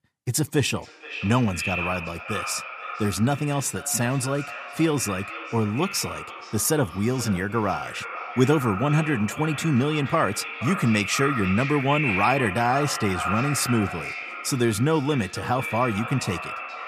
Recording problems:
echo of what is said; strong; throughout; 470 ms later, 7 dB below the speech

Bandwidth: 14.5 kHz